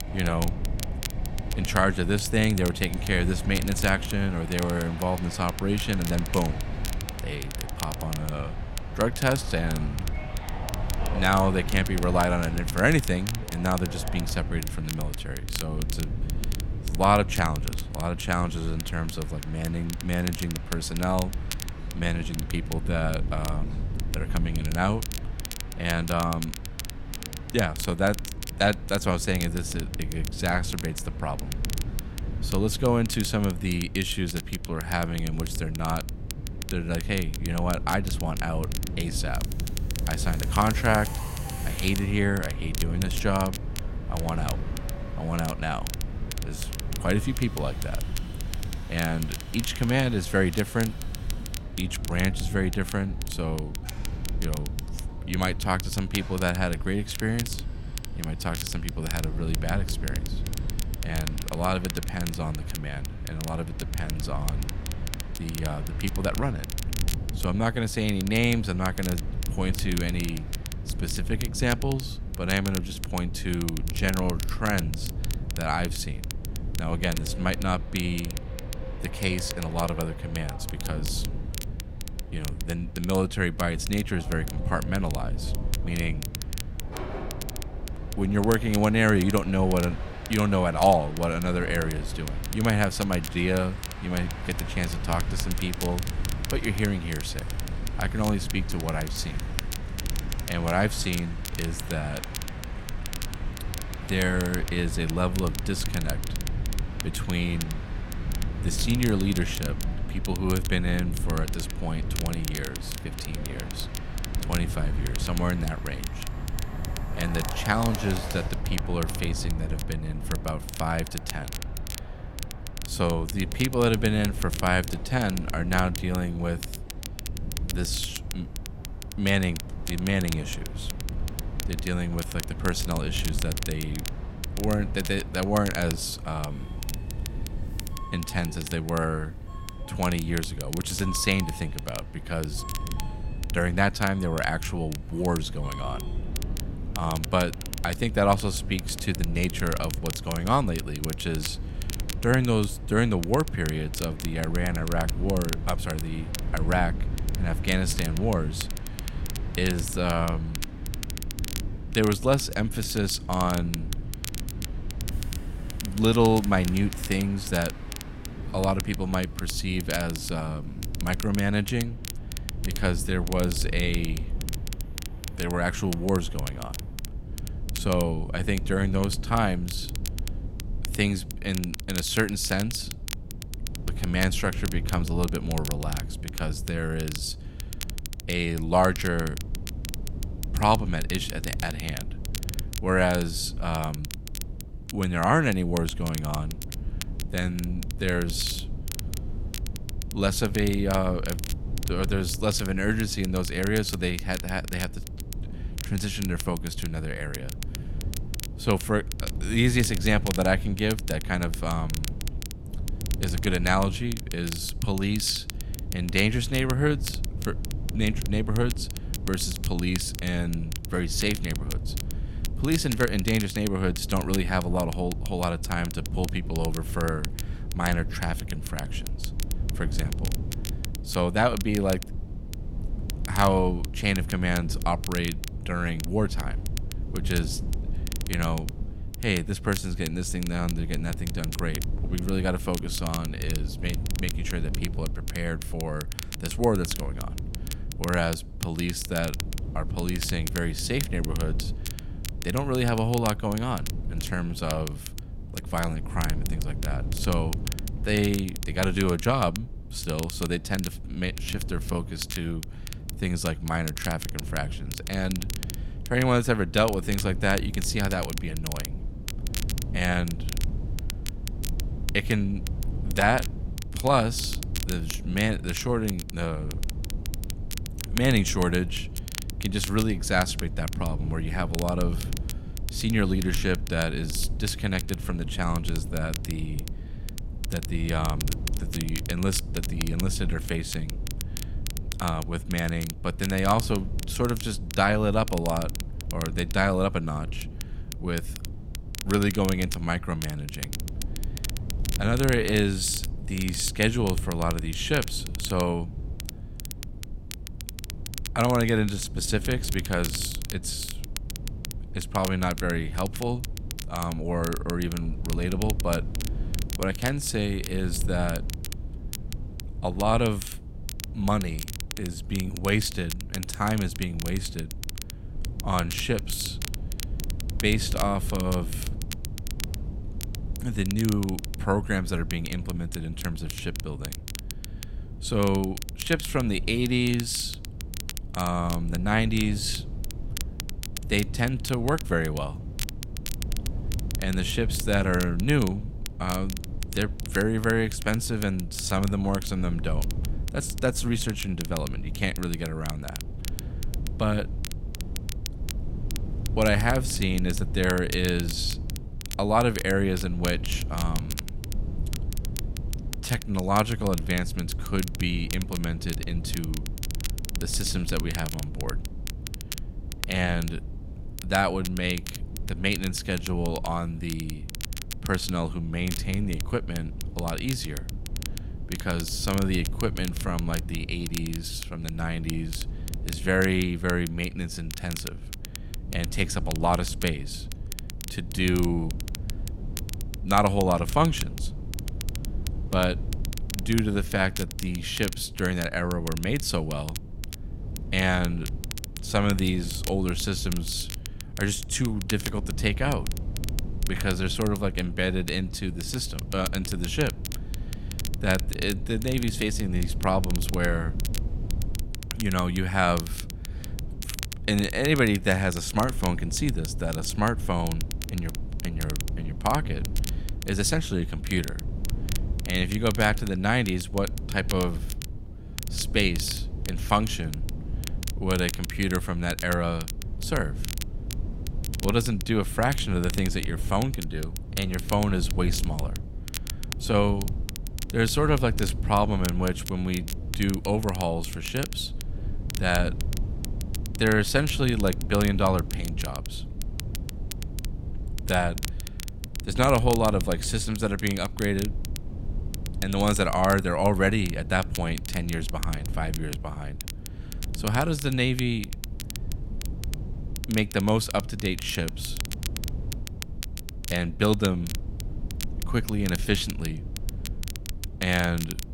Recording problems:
train or aircraft noise; noticeable; until 2:57; 15 dB below the speech
wind noise on the microphone; occasional gusts; 20 dB below the speech
crackle, like an old record; noticeable; 10 dB below the speech

